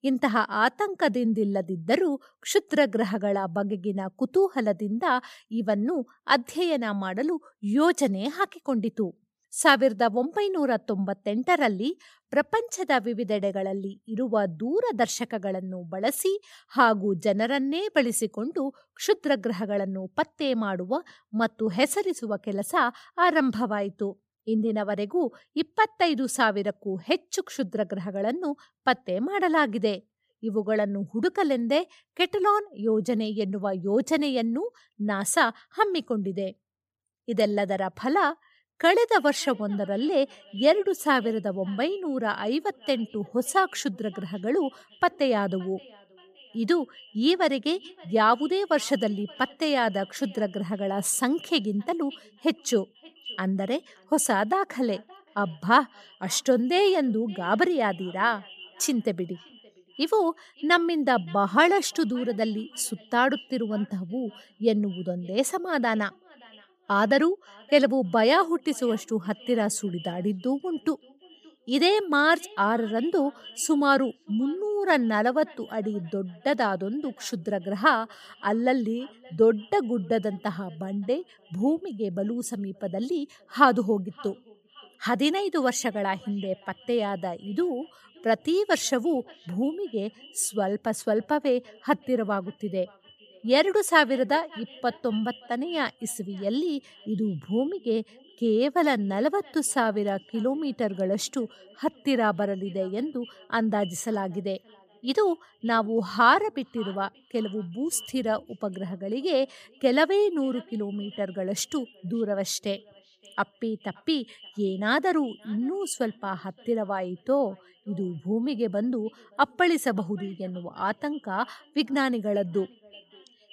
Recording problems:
echo of what is said; faint; from 39 s on; 570 ms later, 25 dB below the speech

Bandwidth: 15 kHz